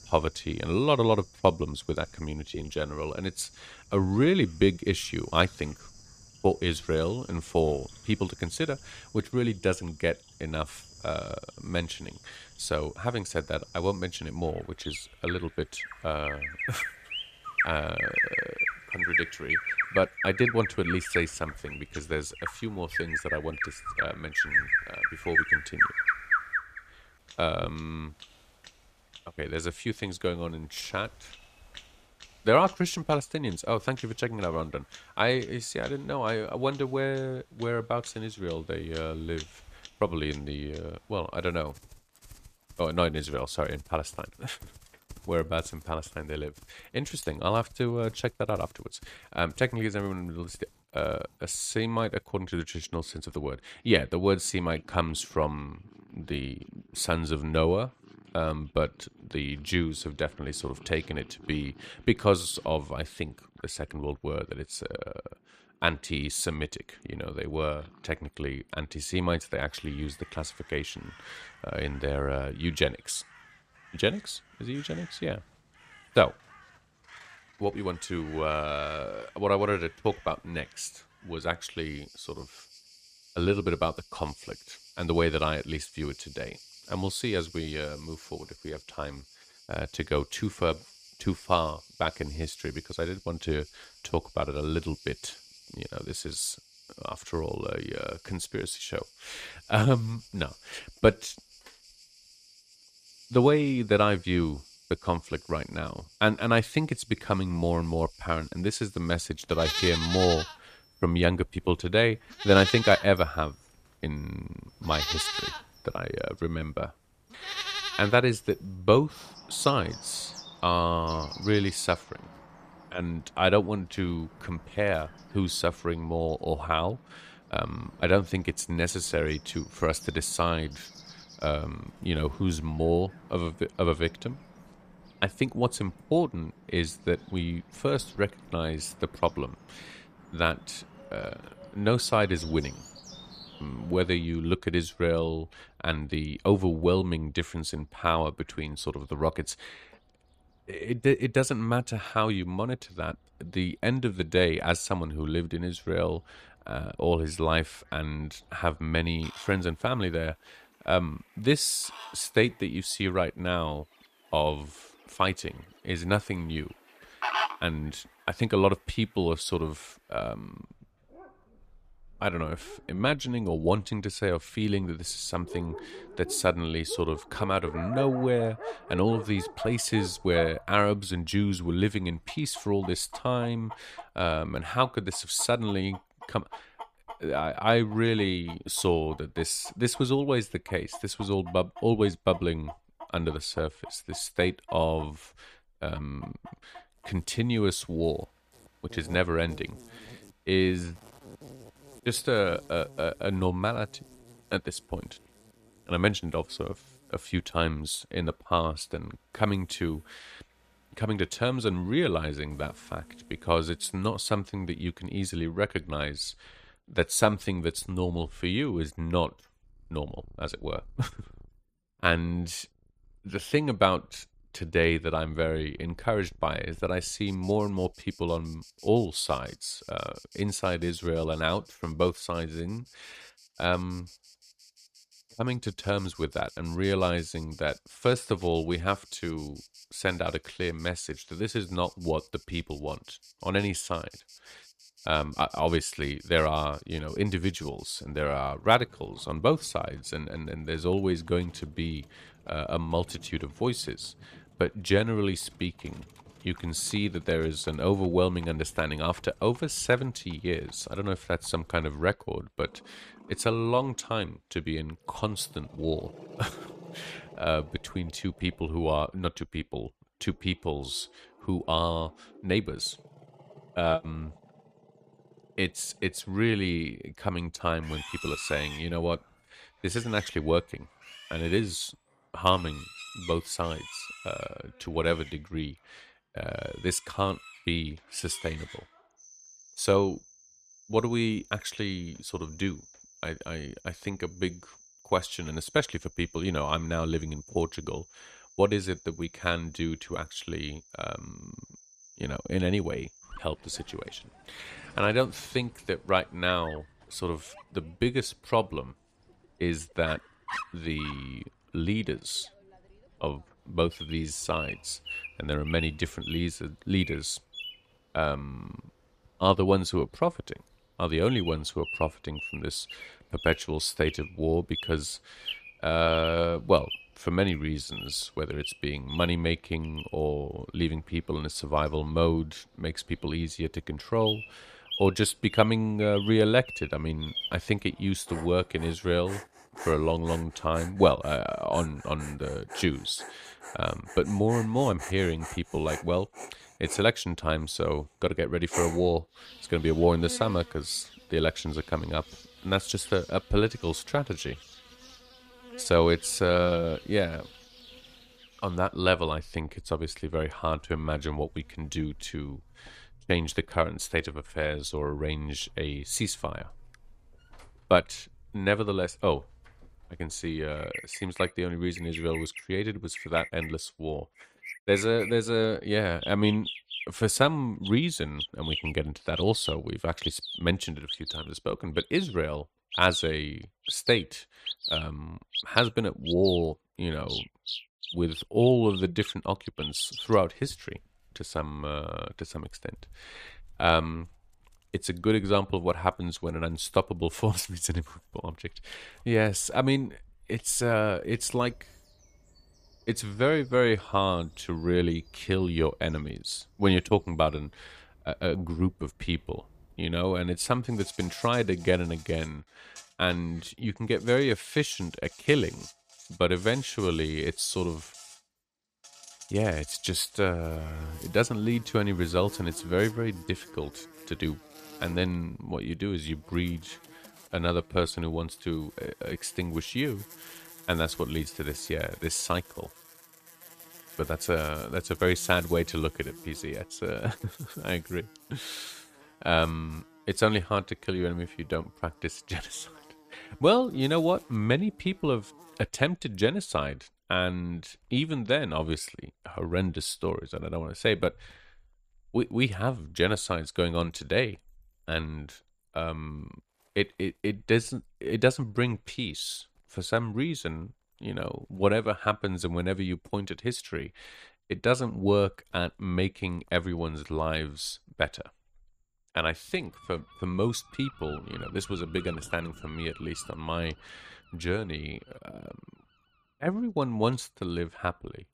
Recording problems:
animal sounds; loud; throughout; 9 dB below the speech

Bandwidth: 14.5 kHz